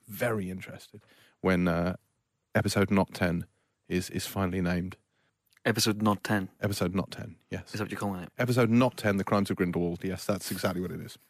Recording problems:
none

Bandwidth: 14.5 kHz